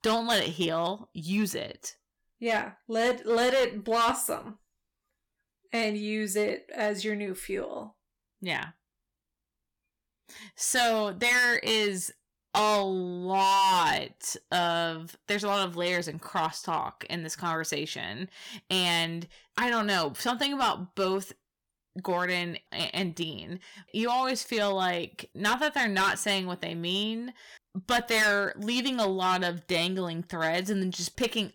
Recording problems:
distortion; heavy; 6% of the sound clipped

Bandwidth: 18.5 kHz